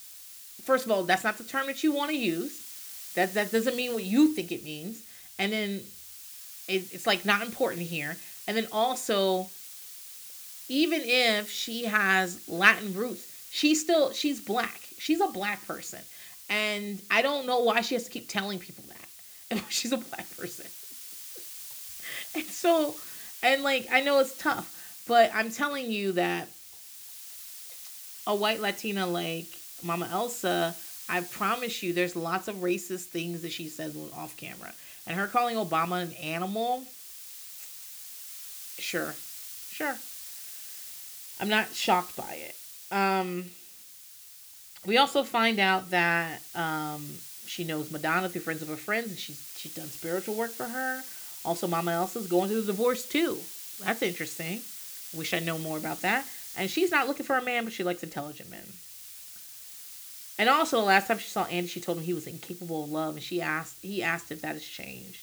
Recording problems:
hiss; noticeable; throughout; 15 dB below the speech

